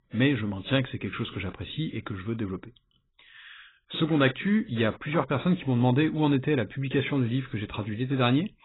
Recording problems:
garbled, watery; badly; nothing above 4 kHz

